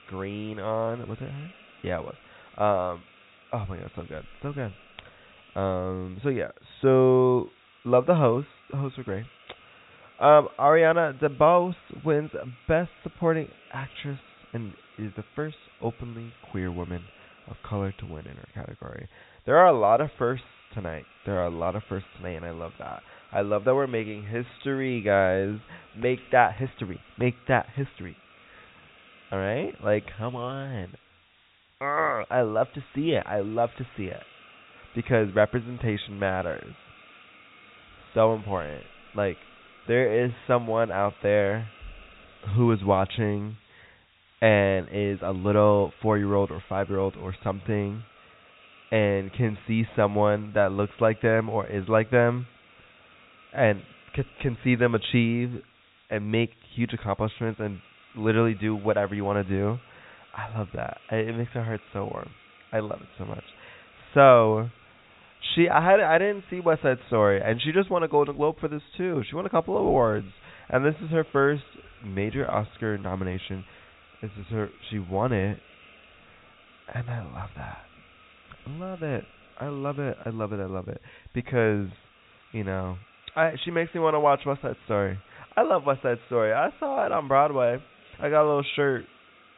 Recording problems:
high frequencies cut off; severe; nothing above 4 kHz
hiss; faint; throughout; 25 dB below the speech

